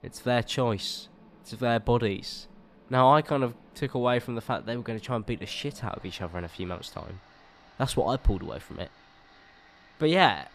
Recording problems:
machinery noise; faint; throughout; 25 dB below the speech

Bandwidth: 14.5 kHz